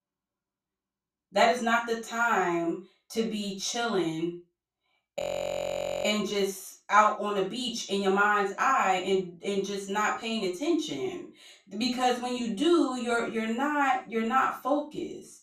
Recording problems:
off-mic speech; far
room echo; noticeable; dies away in 0.3 s
audio freezing; at 5 s for 1 s

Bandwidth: 14.5 kHz